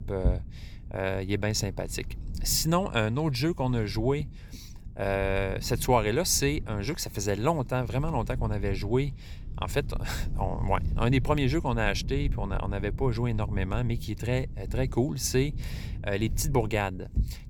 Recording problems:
low rumble; faint; throughout; 20 dB below the speech

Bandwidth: 18.5 kHz